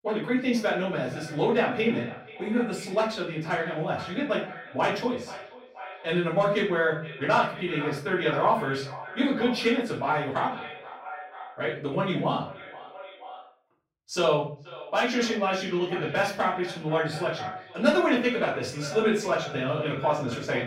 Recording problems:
off-mic speech; far
echo of what is said; noticeable; throughout; 480 ms later, 15 dB below the speech
room echo; slight; dies away in 0.4 s

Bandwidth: 16.5 kHz